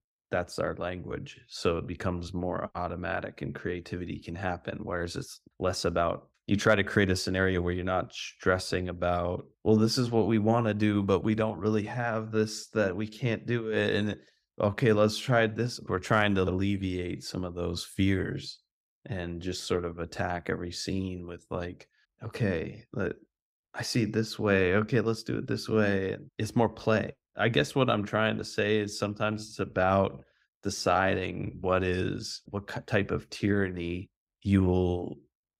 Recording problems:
none

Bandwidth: 15.5 kHz